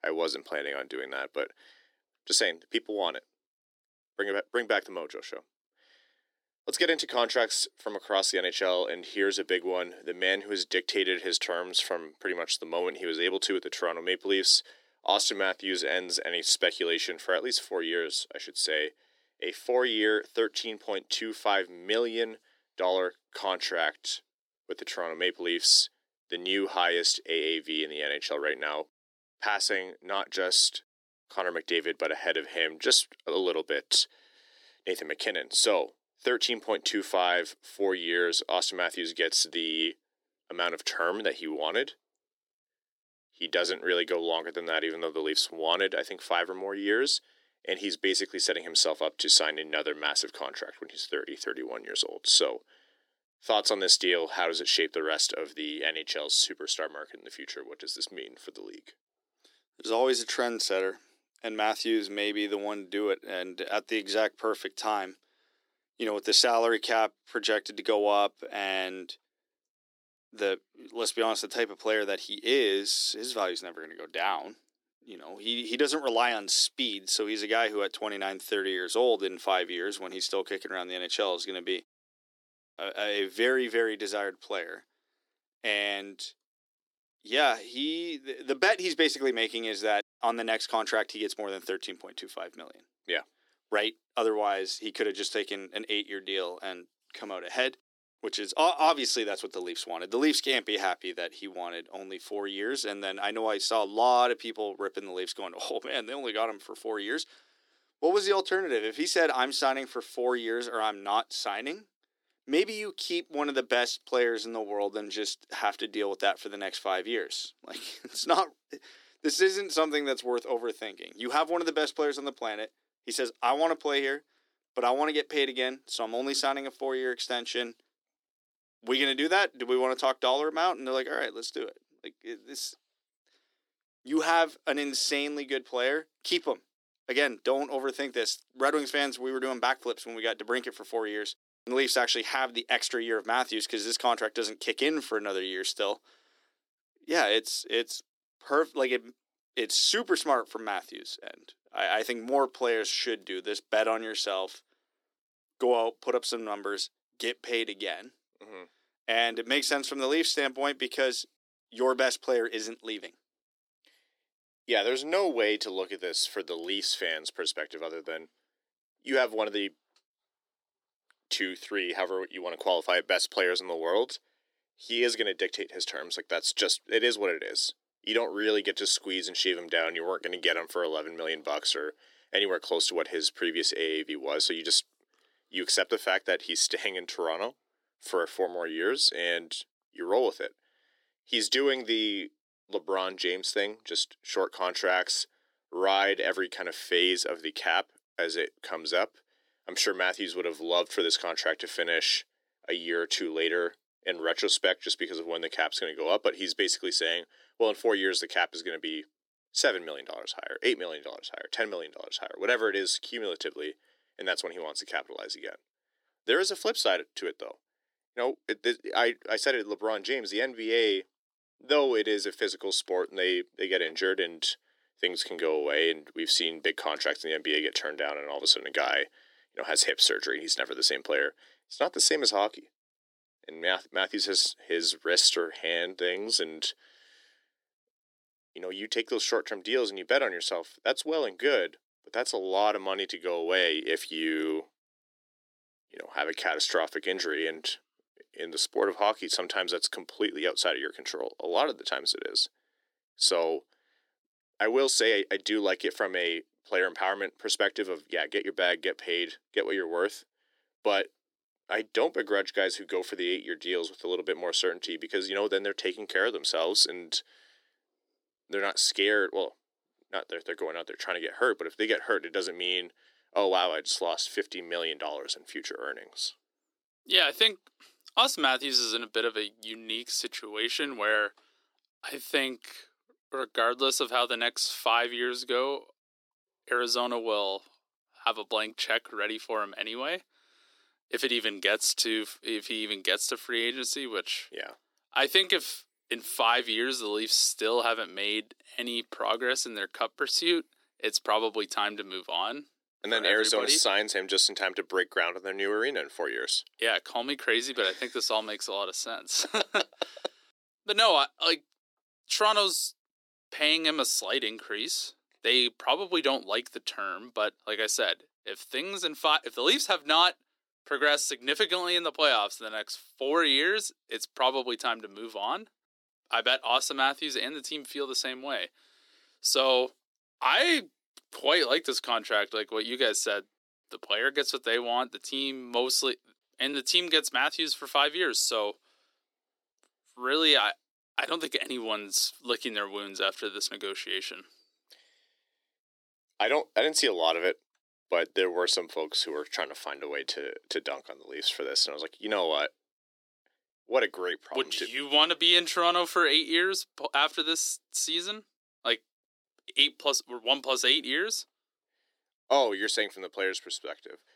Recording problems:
thin; somewhat; fading below 300 Hz

